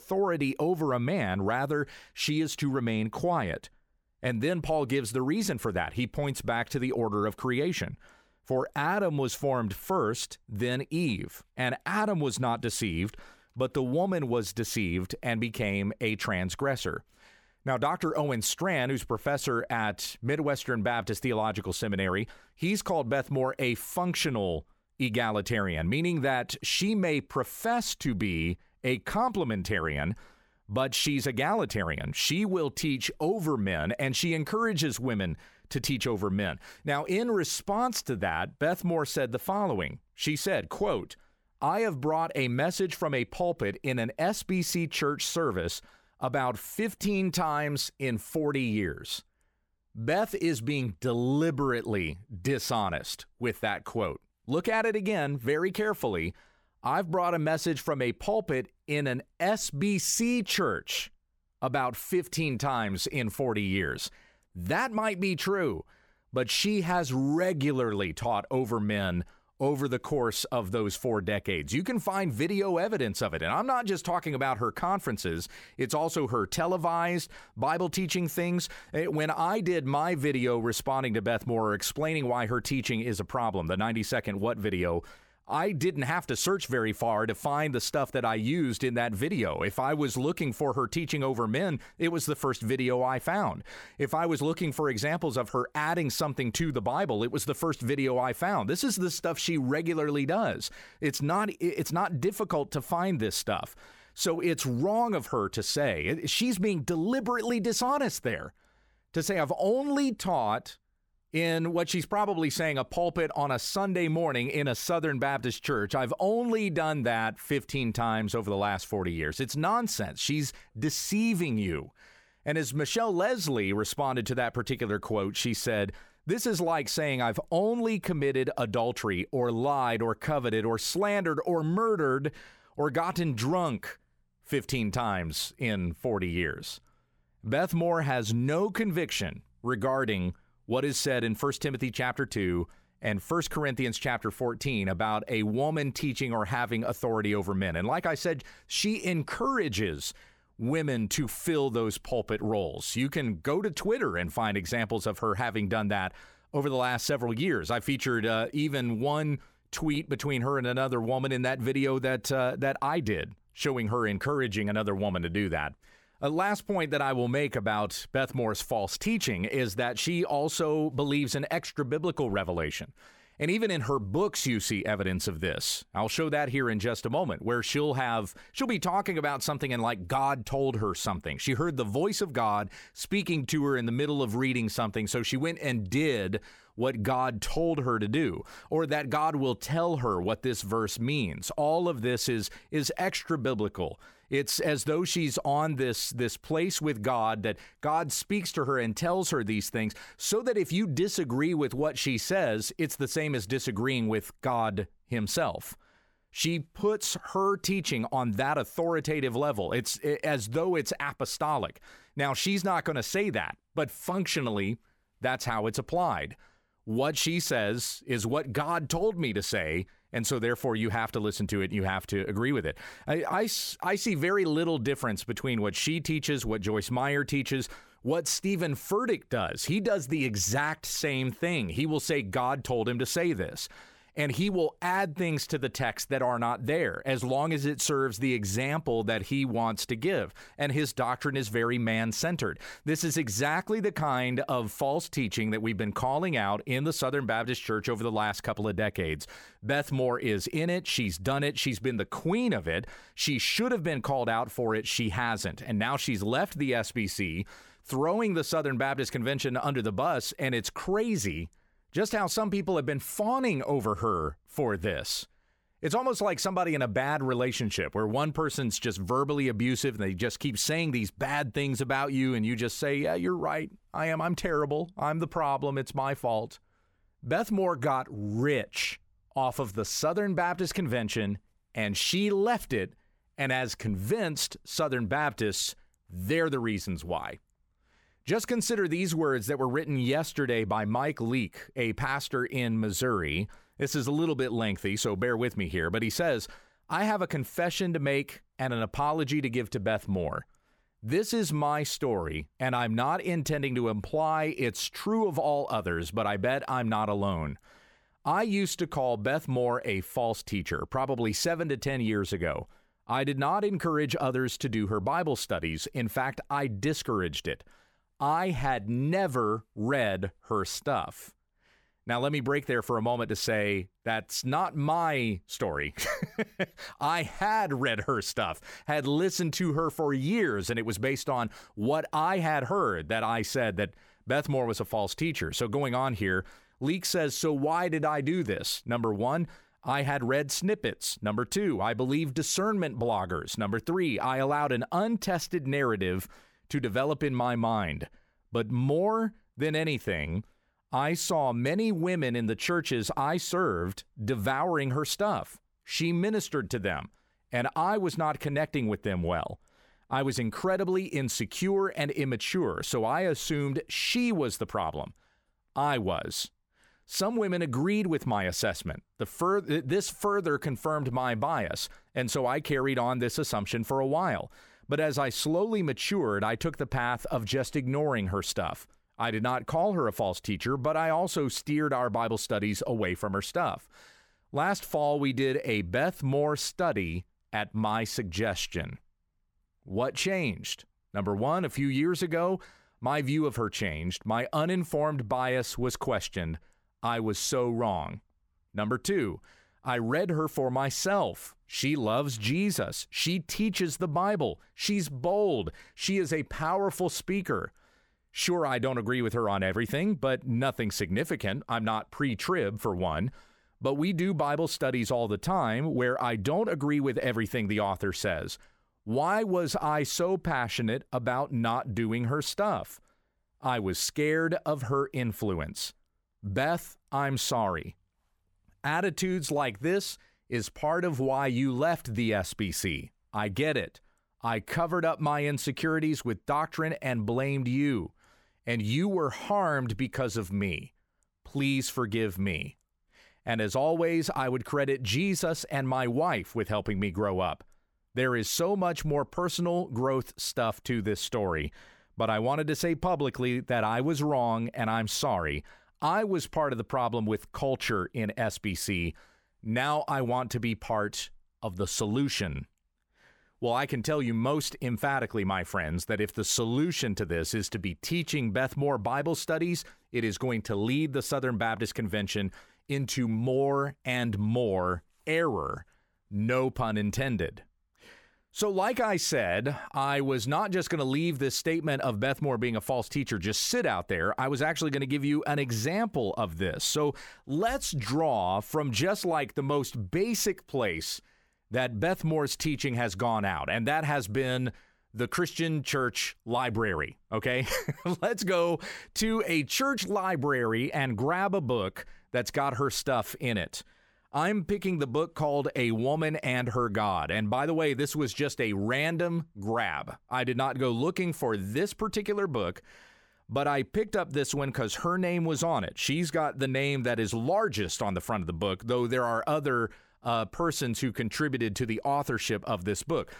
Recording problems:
none

